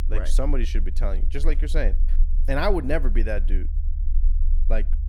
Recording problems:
low rumble; noticeable; throughout; 20 dB below the speech

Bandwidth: 17.5 kHz